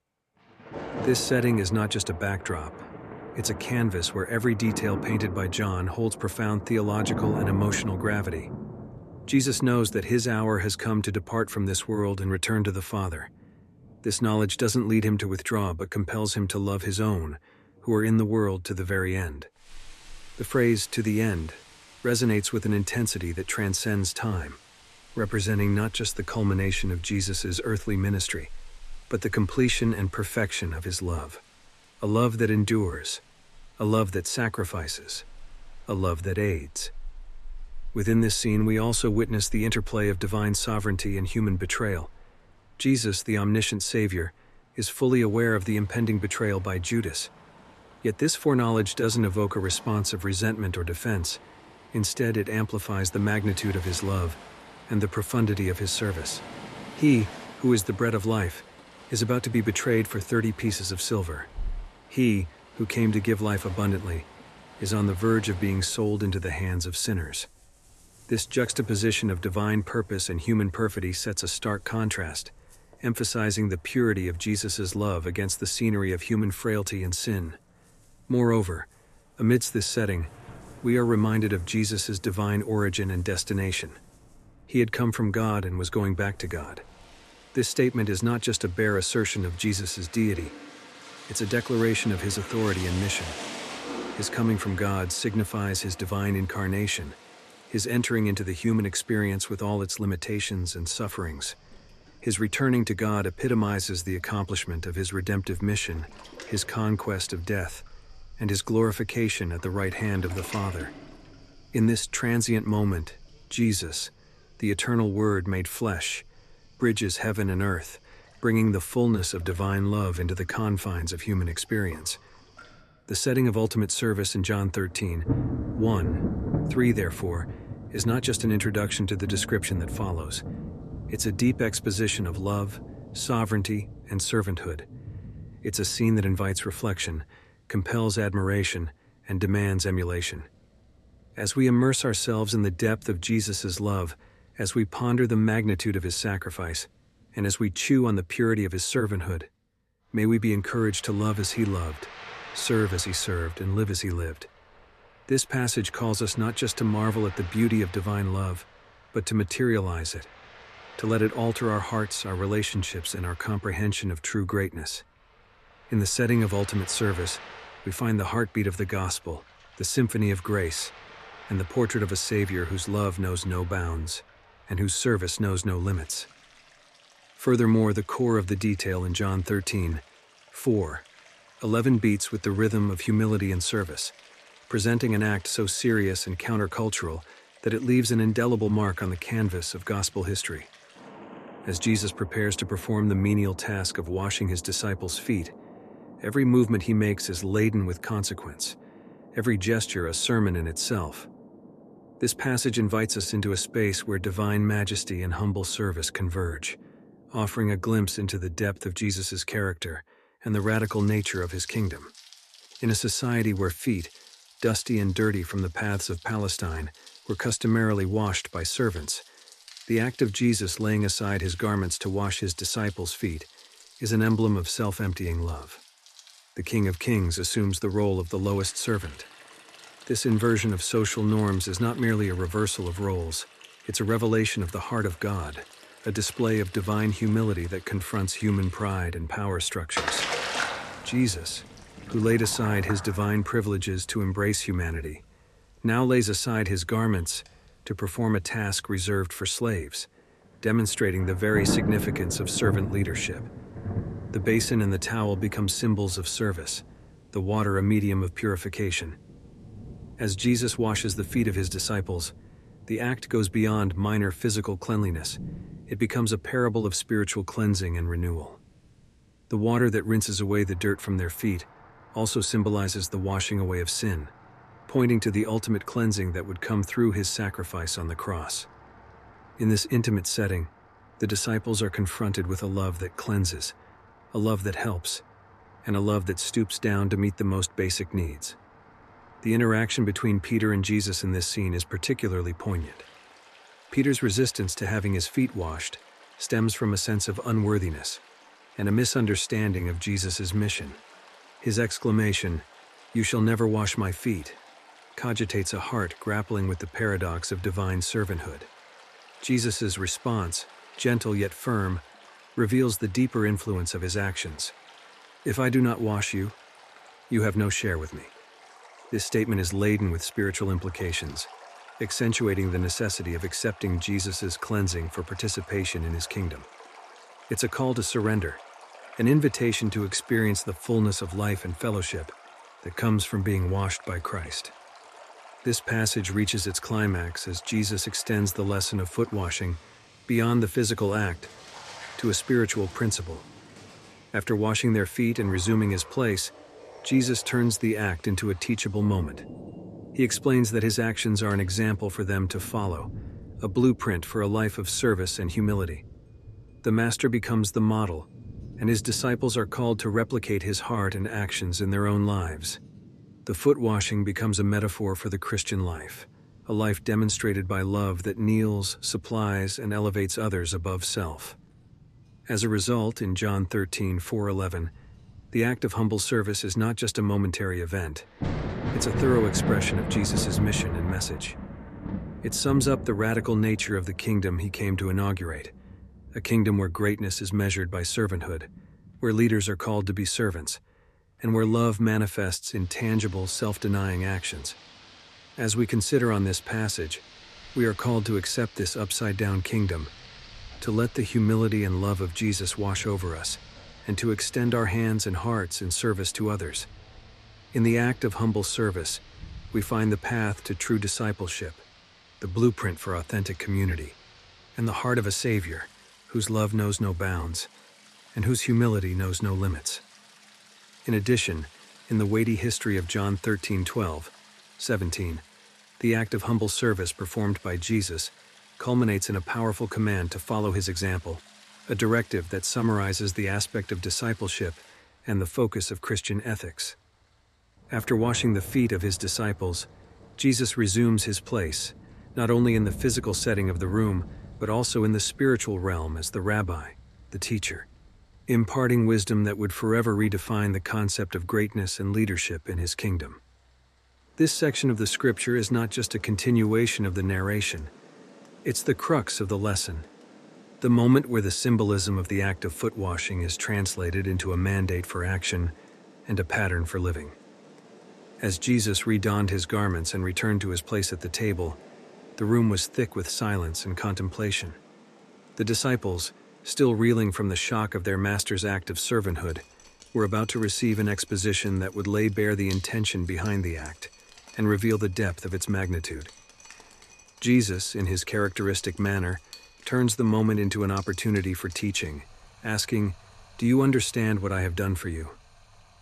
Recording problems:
rain or running water; noticeable; throughout; 15 dB below the speech

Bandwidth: 13.5 kHz